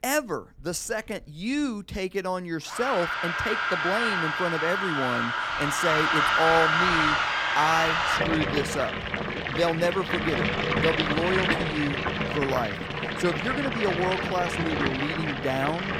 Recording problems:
household noises; very loud; throughout; 3 dB above the speech

